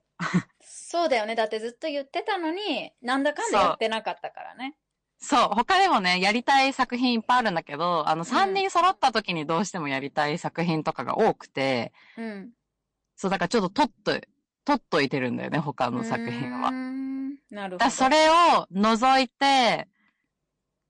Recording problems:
distortion; slight; 4% of the sound clipped
garbled, watery; slightly; nothing above 8.5 kHz

